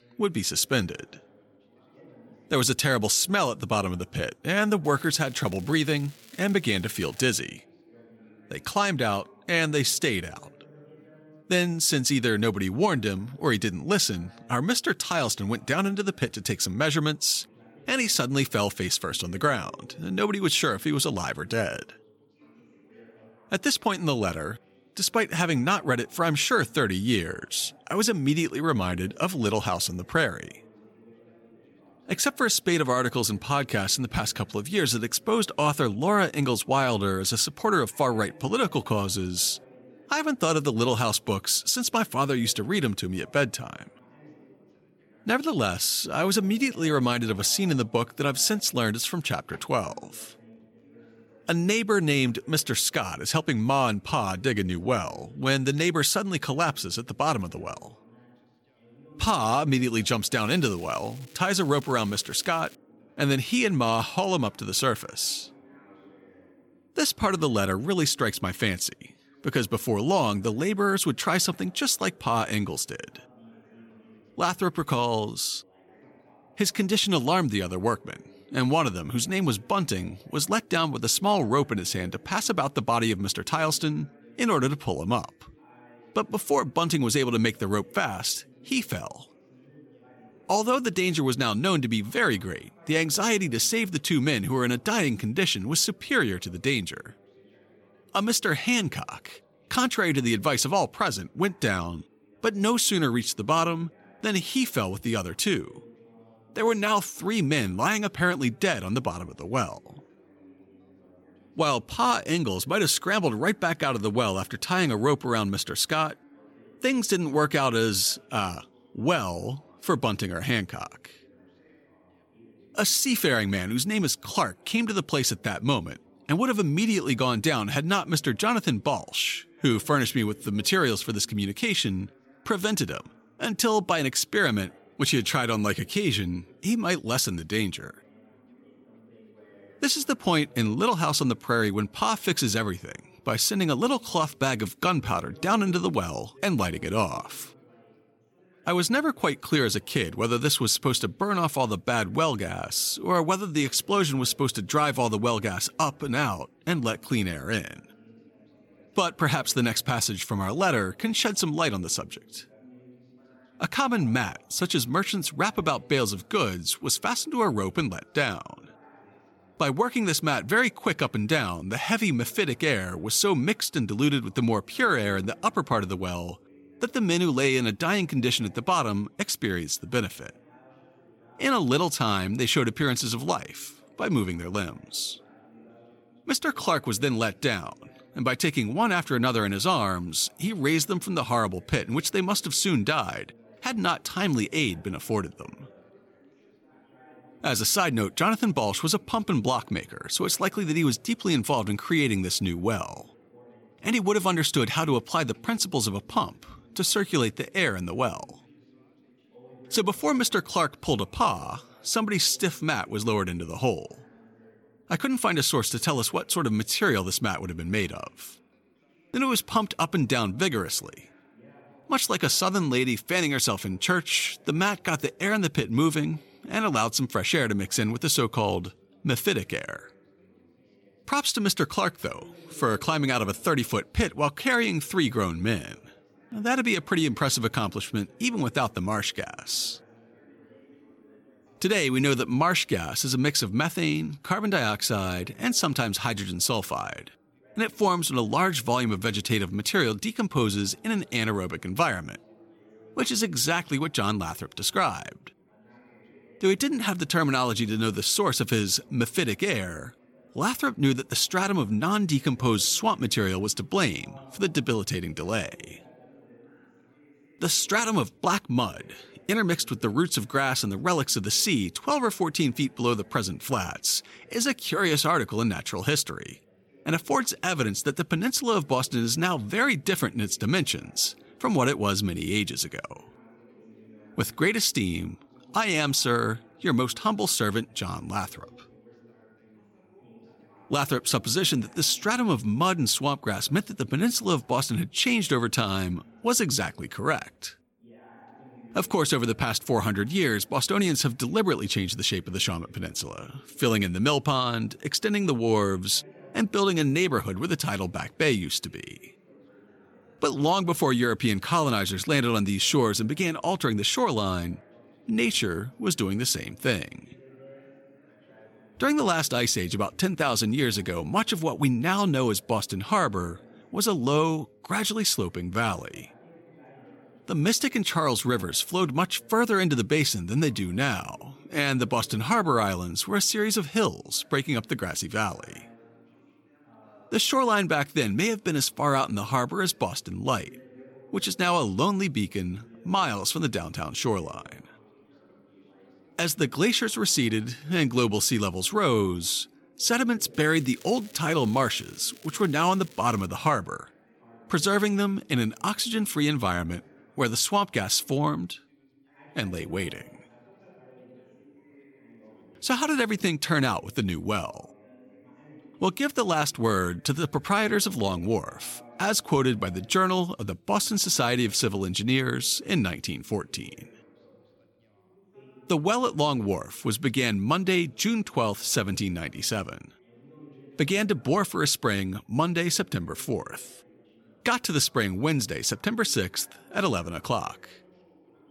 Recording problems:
background chatter; faint; throughout; 3 voices, 30 dB below the speech
crackling; faint; from 5 to 7.5 s, from 1:00 to 1:03 and from 5:50 to 5:53; 25 dB below the speech

